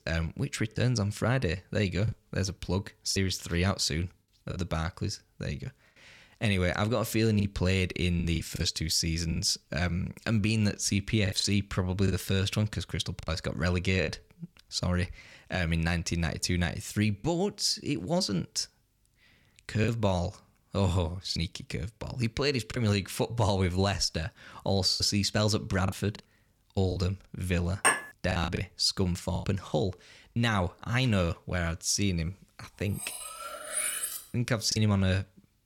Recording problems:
choppy; occasionally; 5% of the speech affected
clattering dishes; loud; at 28 s and from 33 to 34 s; peak 4 dB above the speech

